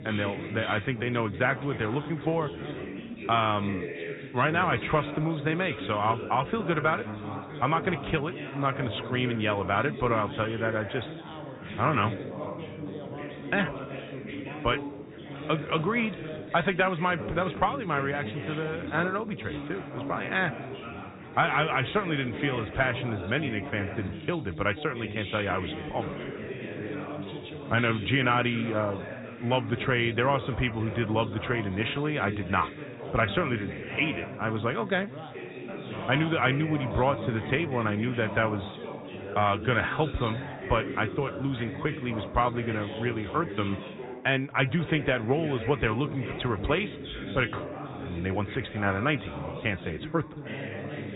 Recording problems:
high frequencies cut off; severe; nothing above 4 kHz
background chatter; loud; throughout; 4 voices, 9 dB below the speech

